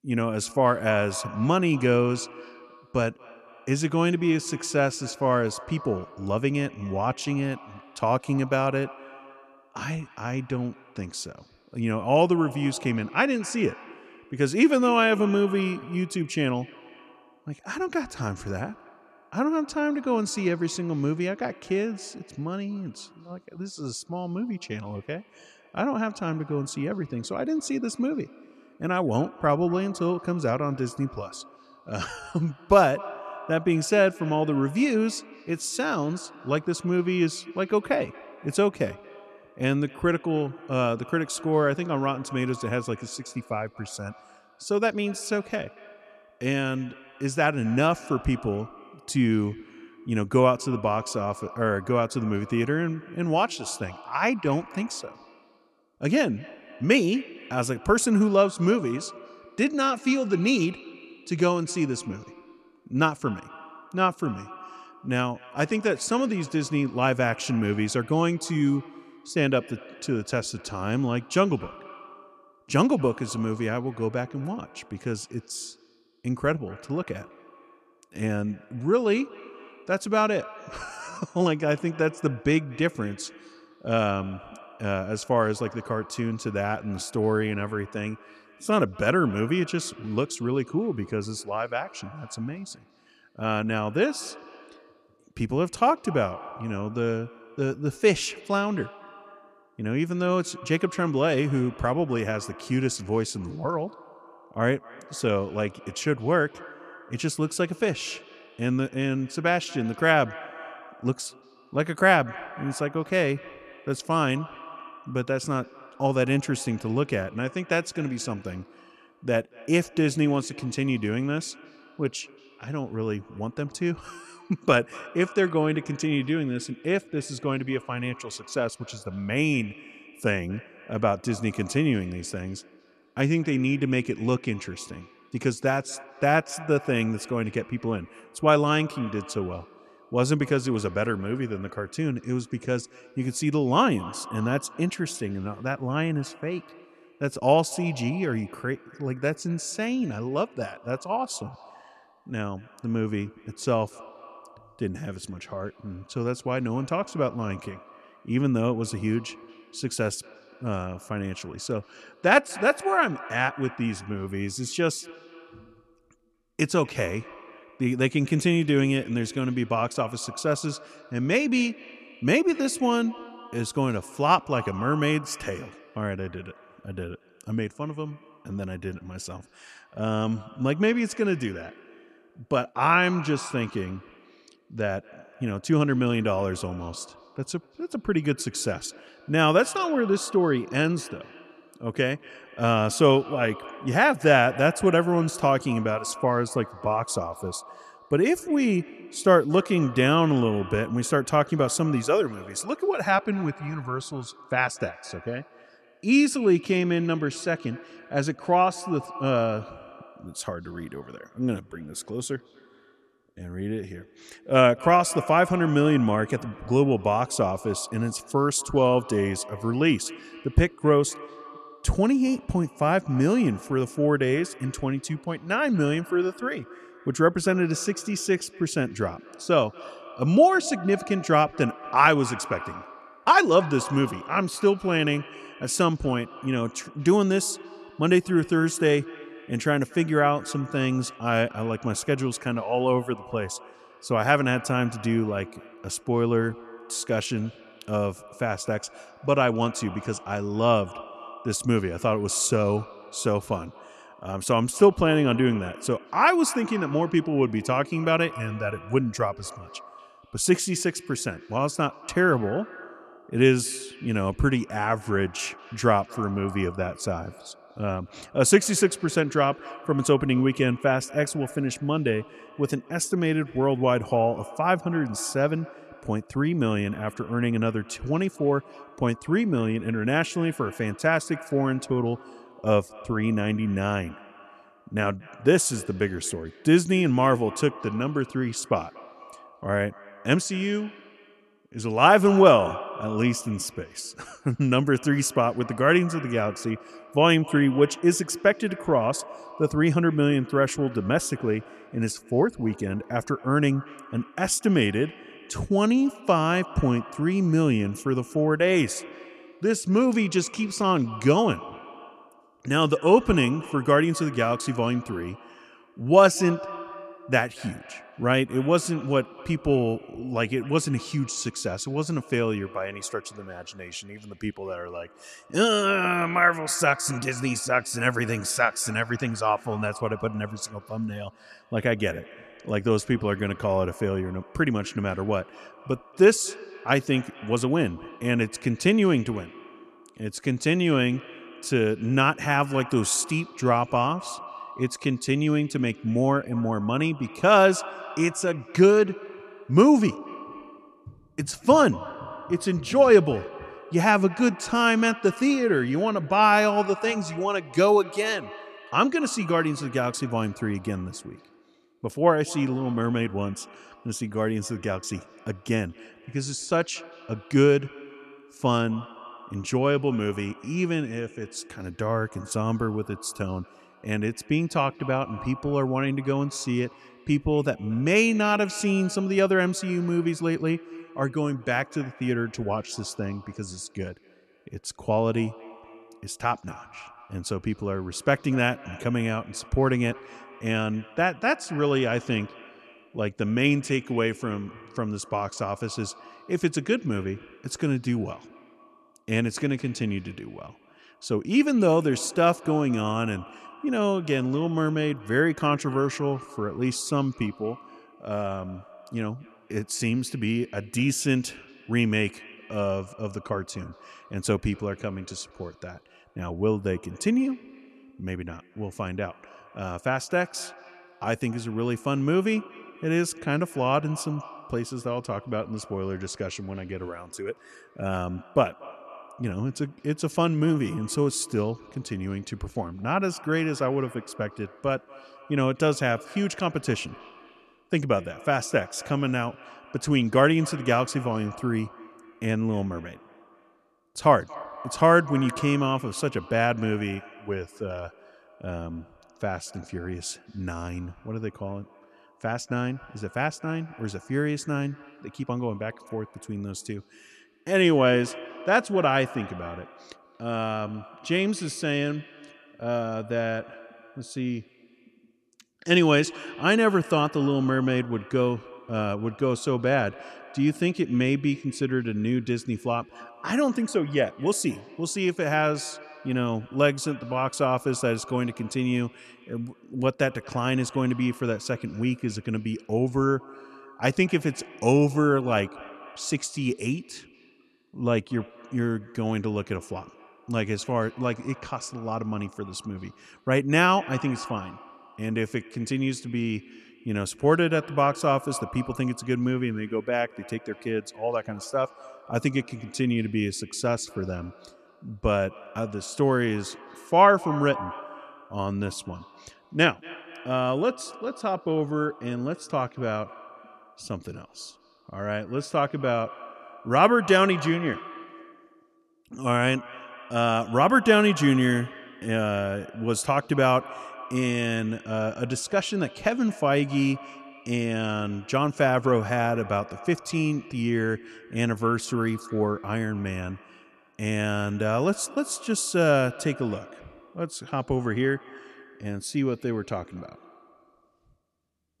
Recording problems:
echo of what is said; faint; throughout; 230 ms later, 20 dB below the speech

